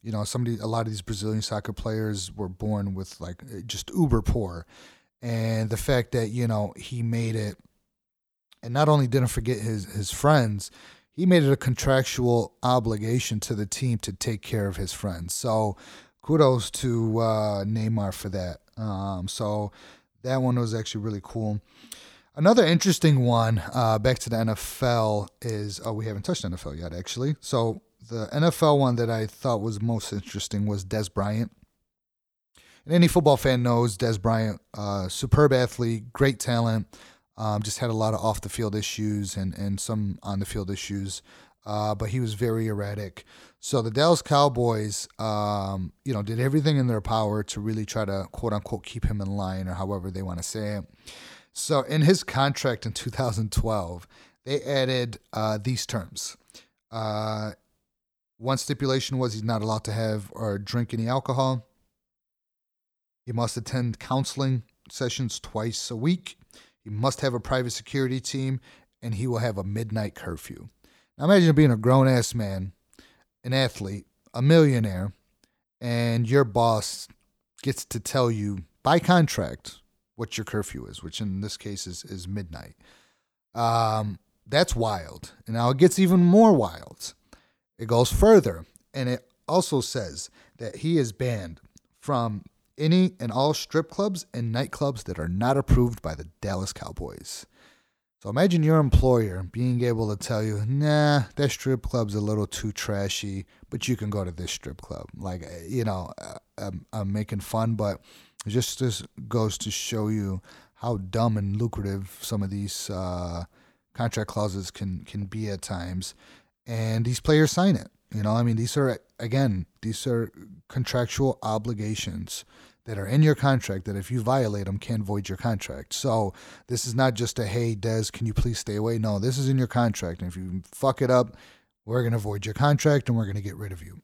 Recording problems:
none

